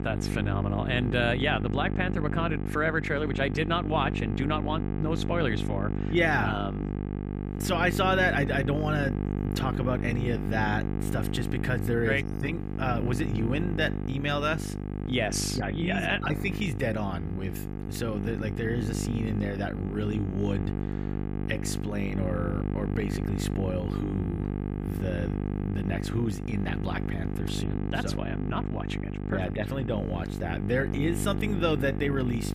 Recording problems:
electrical hum; loud; throughout; 50 Hz, 8 dB below the speech

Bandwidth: 15 kHz